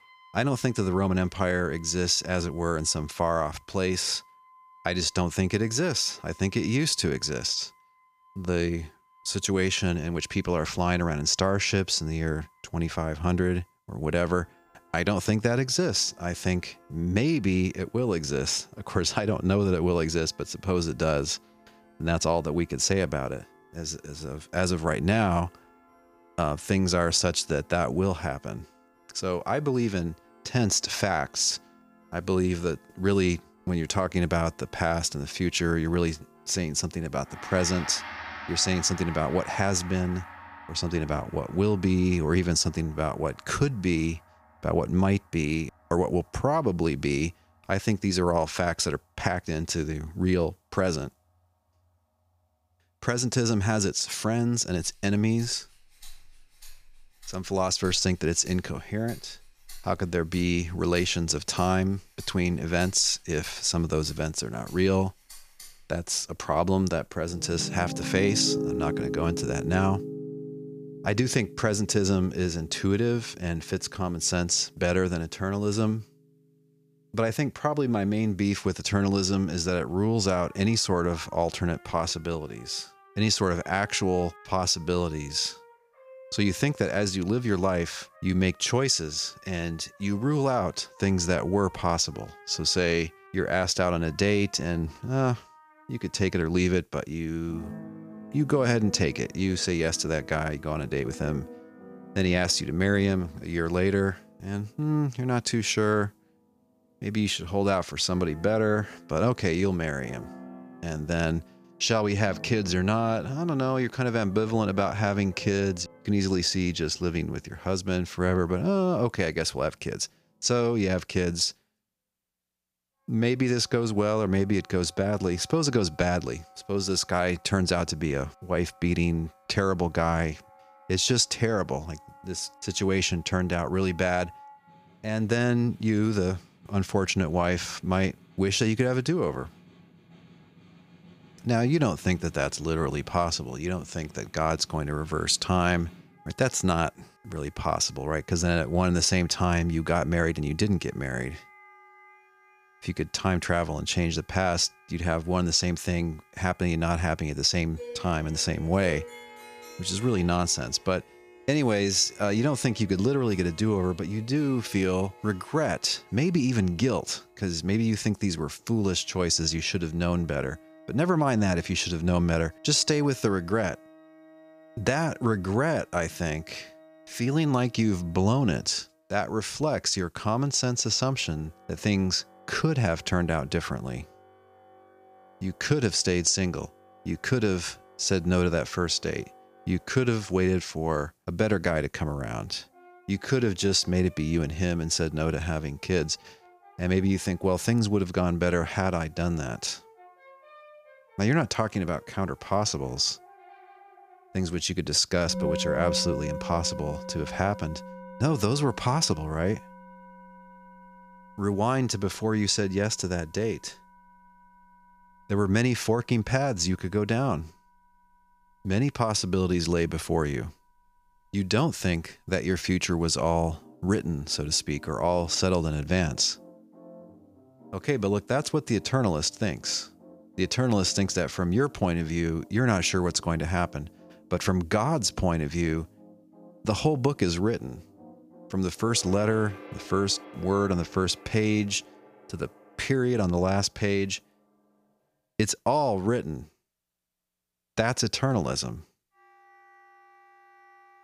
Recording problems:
background music; noticeable; throughout; 20 dB below the speech

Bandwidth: 15 kHz